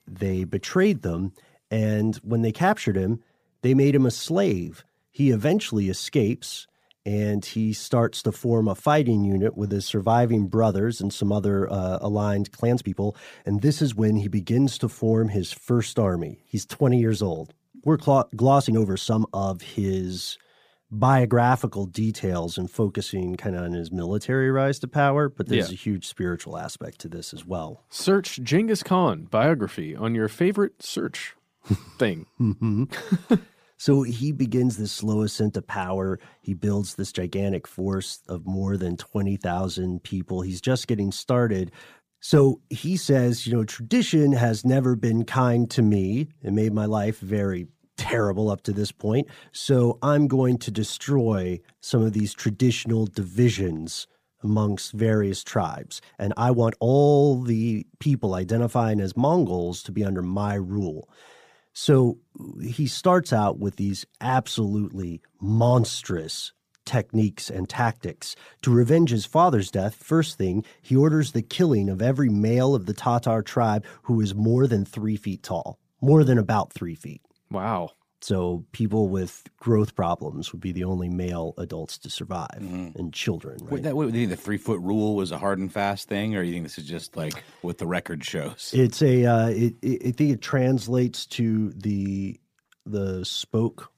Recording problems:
uneven, jittery; strongly; from 13 s to 1:31

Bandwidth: 15 kHz